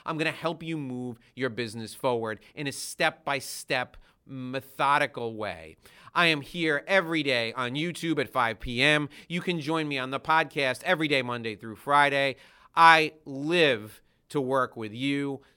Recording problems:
none

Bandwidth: 17 kHz